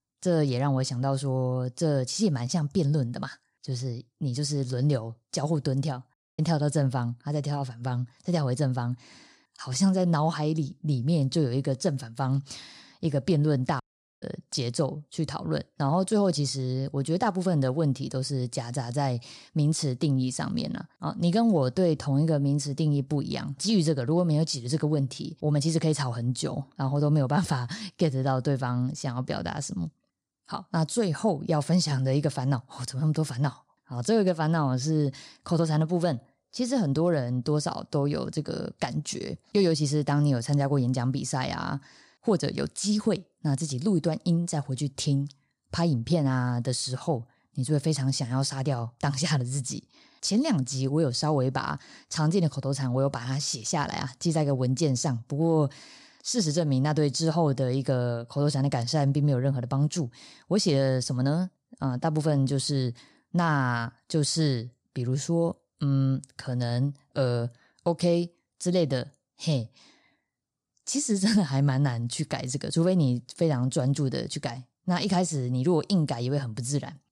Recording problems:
audio cutting out; at 6 s and at 14 s

